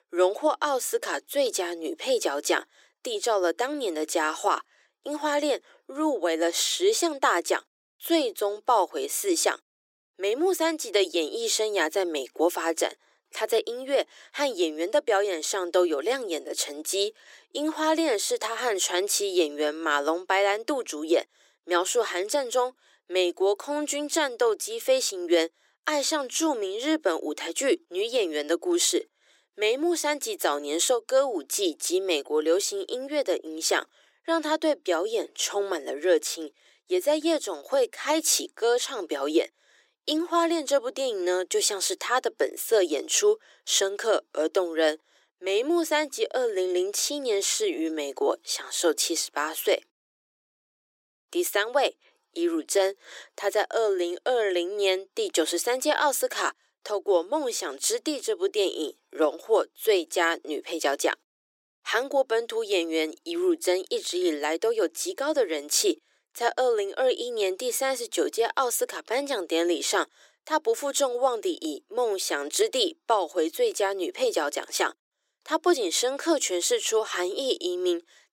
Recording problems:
thin; very; fading below 350 Hz

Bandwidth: 16 kHz